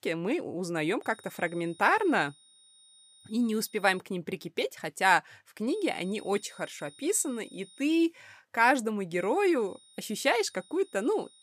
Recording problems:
high-pitched whine; faint; from 1 to 4 s, from 5.5 to 8 s and from 9 s on; 3.5 kHz, 25 dB below the speech

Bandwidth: 15 kHz